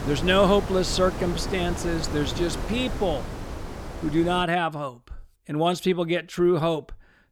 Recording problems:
wind noise on the microphone; occasional gusts; until 4.5 s; 10 dB below the speech

